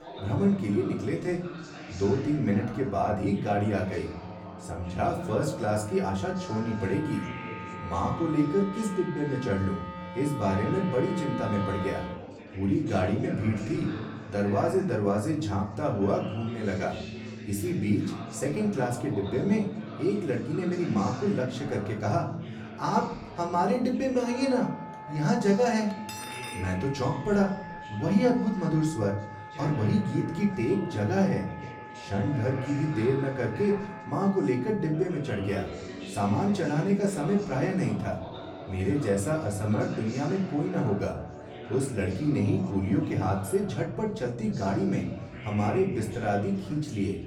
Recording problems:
off-mic speech; far
room echo; slight; dies away in 0.5 s
background music; noticeable; throughout; 15 dB below the speech
chatter from many people; noticeable; throughout; 15 dB below the speech
clattering dishes; faint; at 26 s; peak 10 dB below the speech

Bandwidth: 18.5 kHz